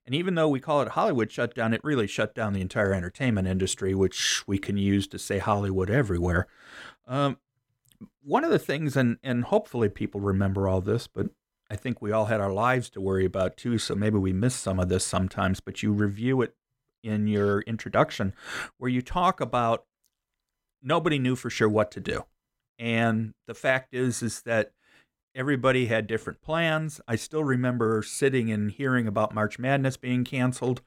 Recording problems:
none

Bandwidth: 16.5 kHz